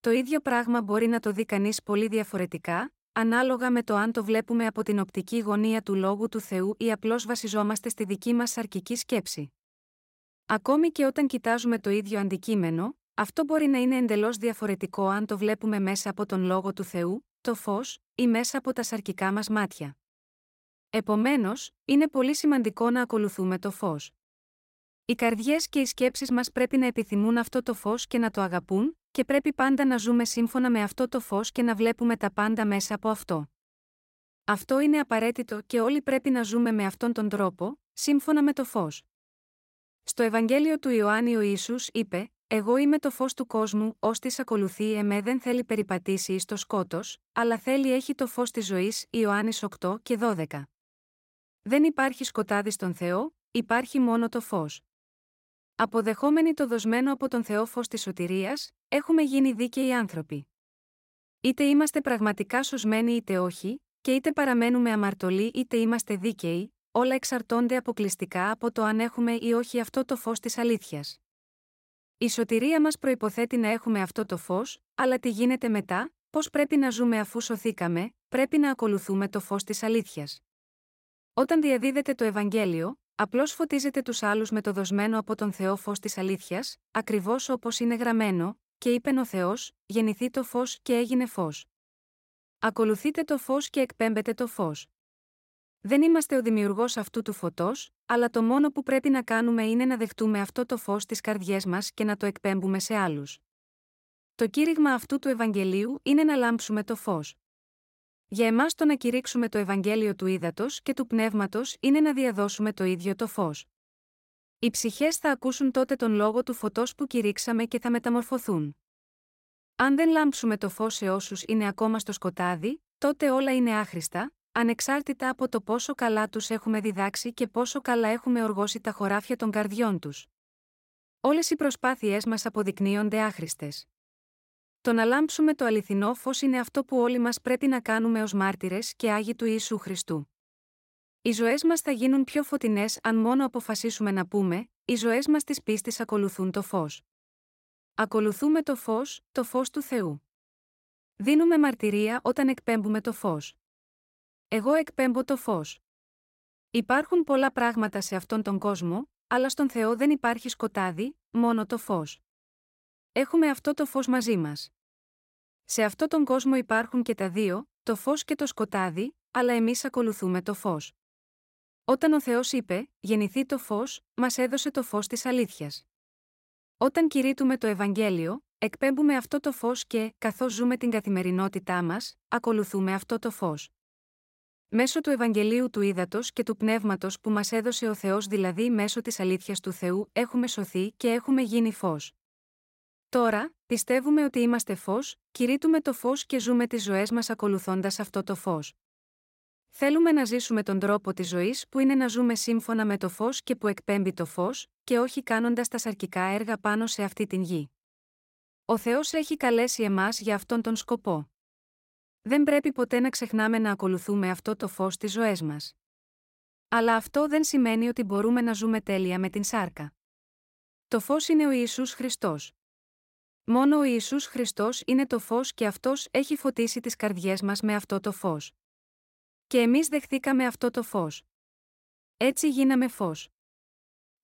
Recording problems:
none

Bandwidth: 16 kHz